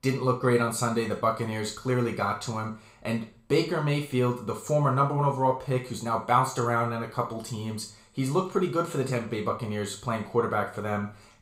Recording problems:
room echo; slight; dies away in 0.4 s
off-mic speech; somewhat distant

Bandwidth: 15.5 kHz